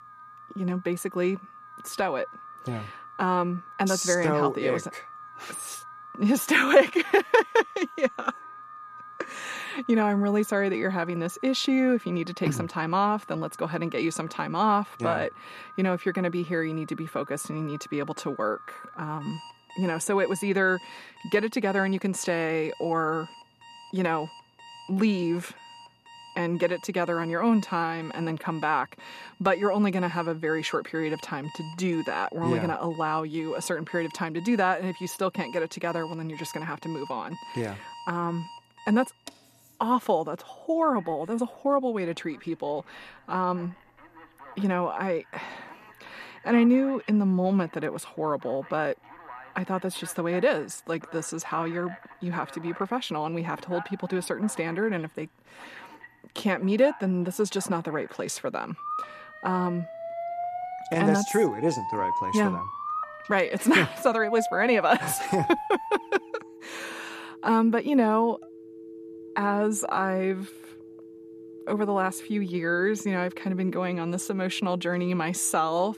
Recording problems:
alarms or sirens; noticeable; throughout; 15 dB below the speech

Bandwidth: 14.5 kHz